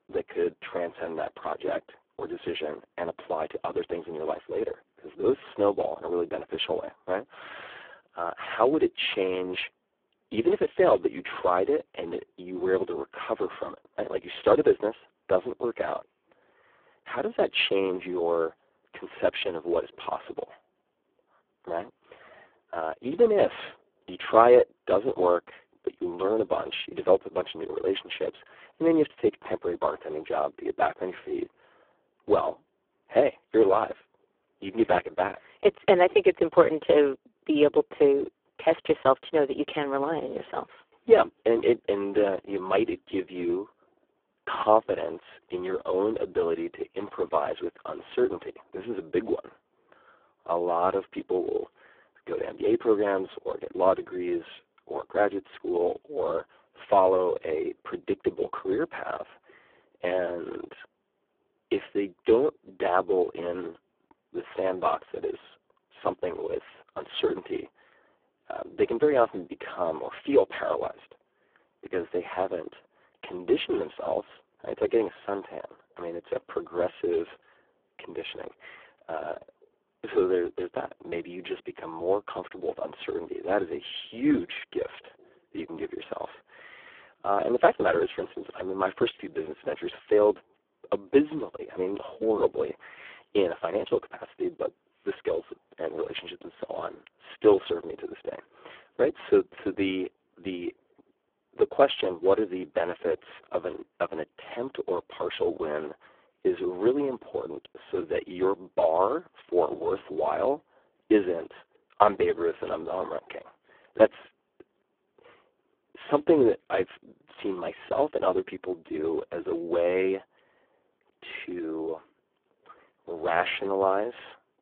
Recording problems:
phone-call audio; poor line

